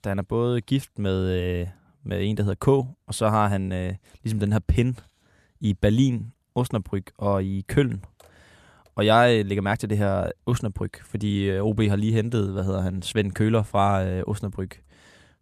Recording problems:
none

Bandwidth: 14 kHz